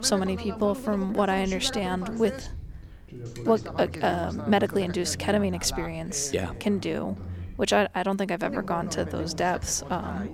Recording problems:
background chatter; noticeable; throughout; 2 voices, 10 dB below the speech

